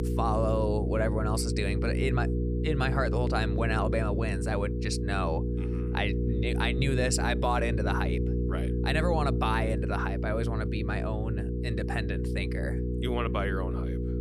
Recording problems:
electrical hum; loud; throughout; 60 Hz, 6 dB below the speech

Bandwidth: 15 kHz